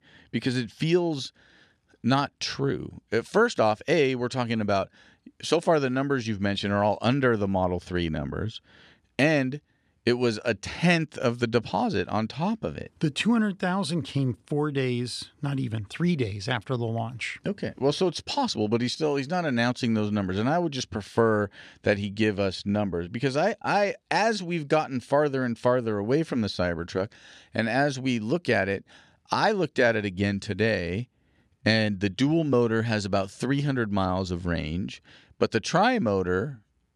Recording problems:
none

